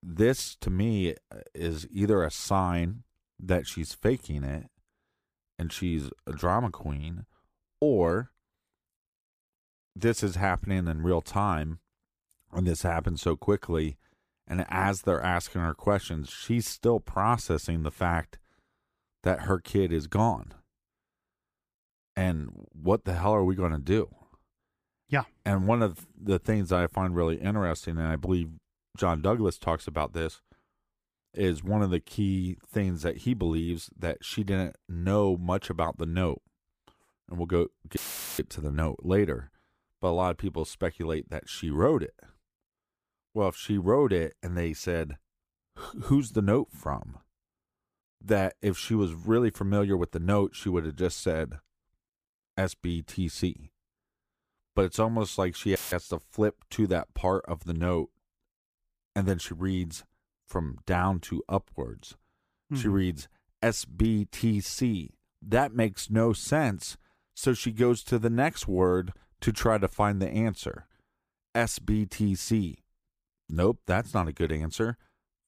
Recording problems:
audio cutting out; filled with static; at 38 s and at 56 s

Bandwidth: 15 kHz